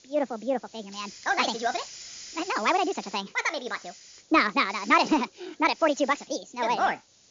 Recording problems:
wrong speed and pitch; too fast and too high; 1.6 times normal speed
high frequencies cut off; noticeable; nothing above 7 kHz
hiss; noticeable; throughout; 20 dB below the speech

